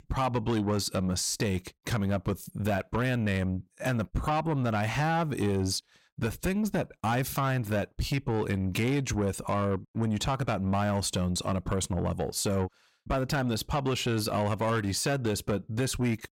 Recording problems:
distortion; slight; 10 dB below the speech

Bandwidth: 16 kHz